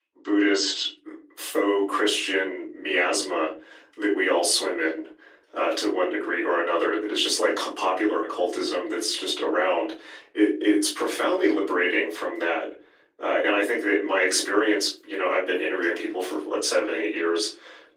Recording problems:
off-mic speech; far
thin; very; fading below 300 Hz
room echo; slight; dies away in 0.3 s
garbled, watery; slightly

